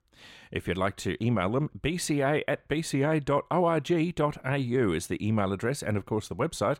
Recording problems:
none

